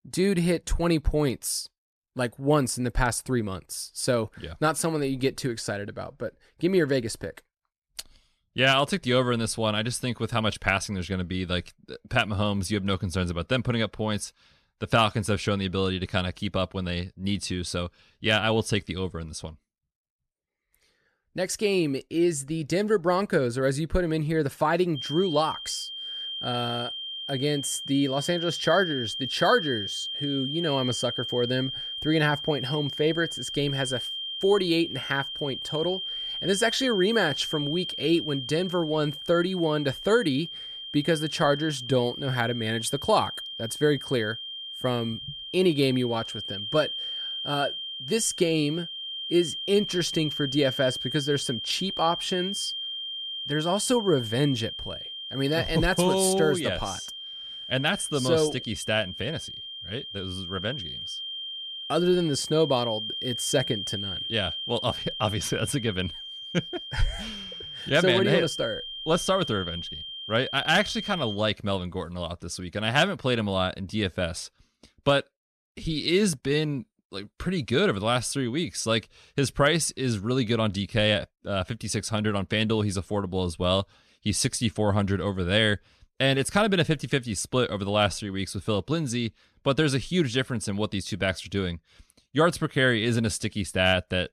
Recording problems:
high-pitched whine; loud; from 25 s to 1:11; 3 kHz, 6 dB below the speech

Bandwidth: 13.5 kHz